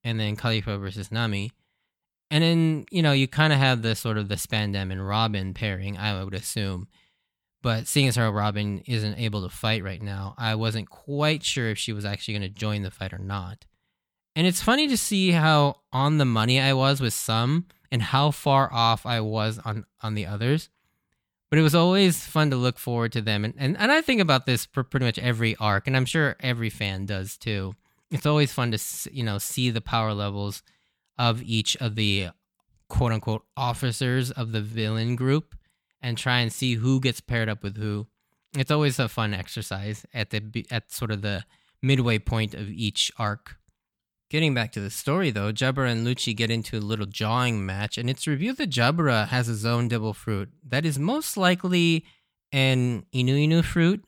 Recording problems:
none

